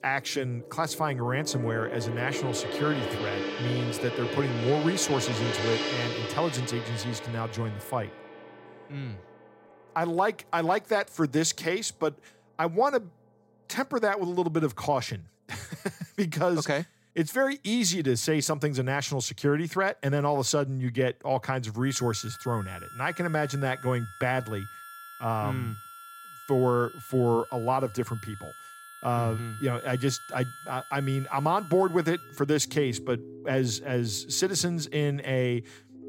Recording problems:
background music; loud; throughout; 9 dB below the speech

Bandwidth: 16 kHz